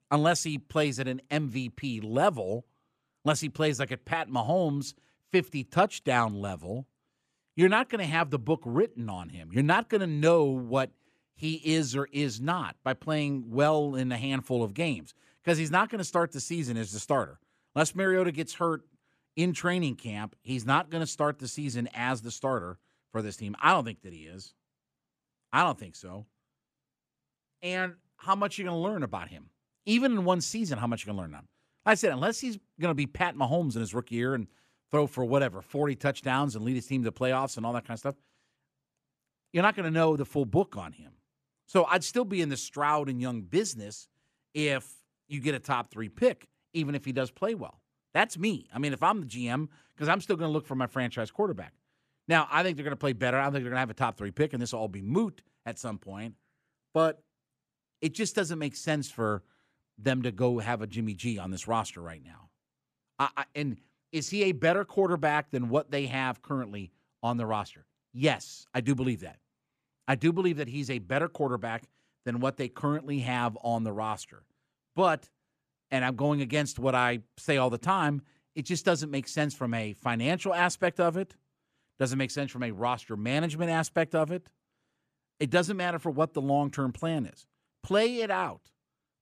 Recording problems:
none

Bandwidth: 14.5 kHz